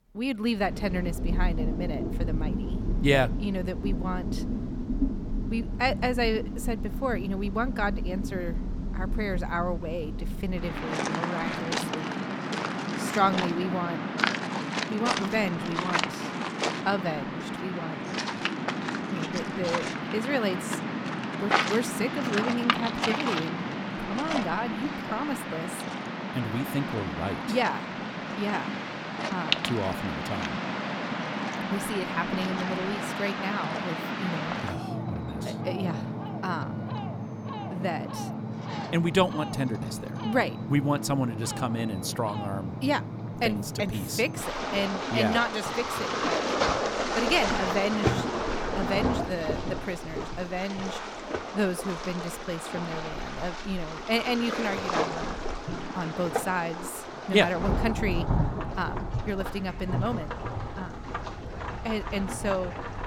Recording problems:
rain or running water; loud; throughout; 1 dB below the speech

